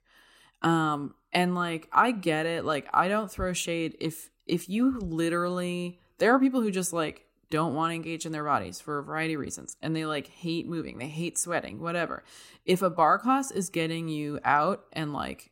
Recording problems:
none

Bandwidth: 16 kHz